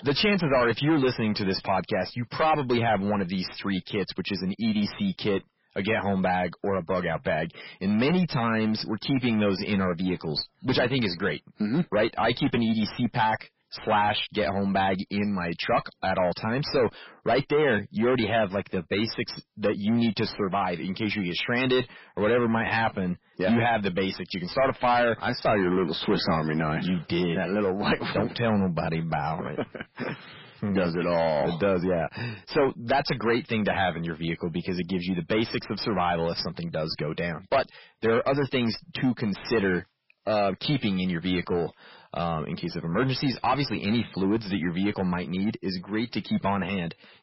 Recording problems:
distortion; heavy; 6 dB below the speech
garbled, watery; badly; nothing above 5.5 kHz

